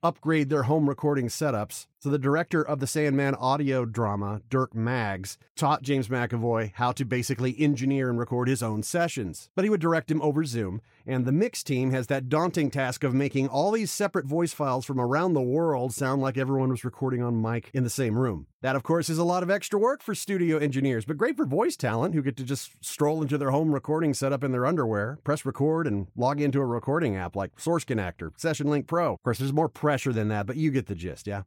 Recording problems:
none

